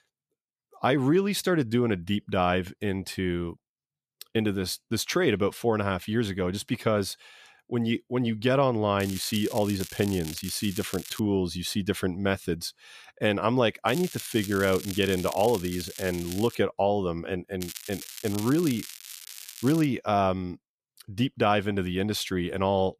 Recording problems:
crackling; noticeable; from 9 to 11 s, from 14 to 17 s and from 18 to 20 s; 10 dB below the speech

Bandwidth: 14.5 kHz